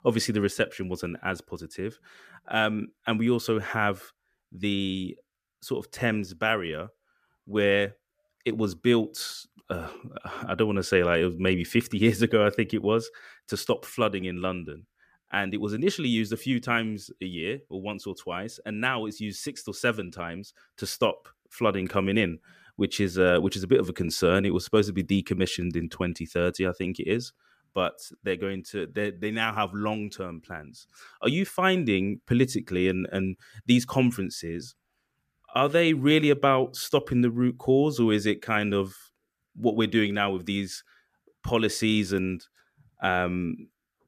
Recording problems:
none

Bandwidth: 15 kHz